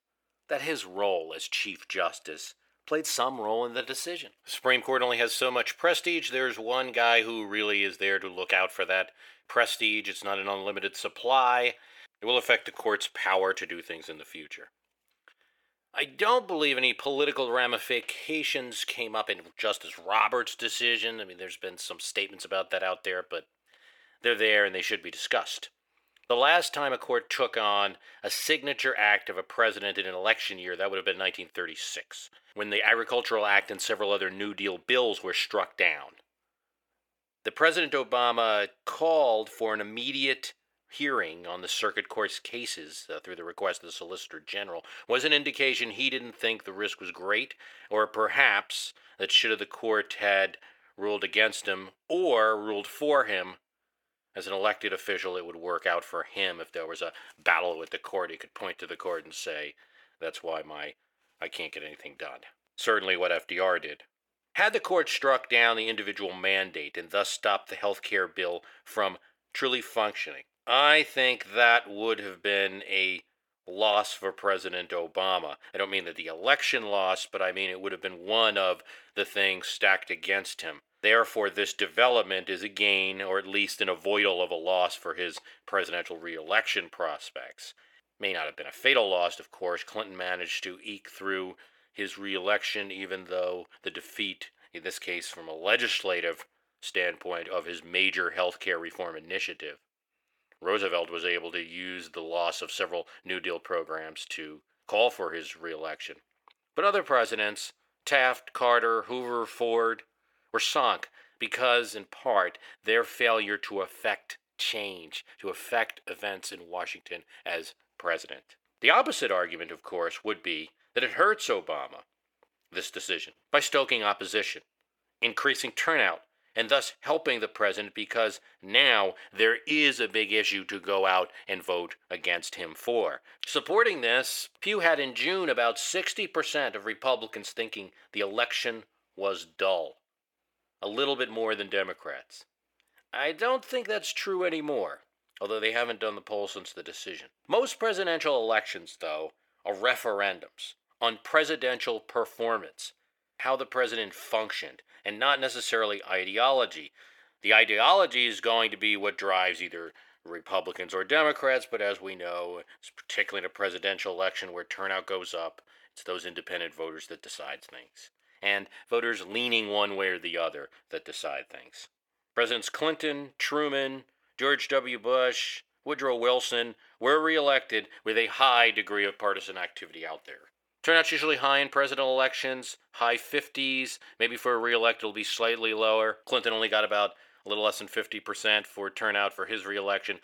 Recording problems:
thin; very; fading below 600 Hz

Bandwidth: 18.5 kHz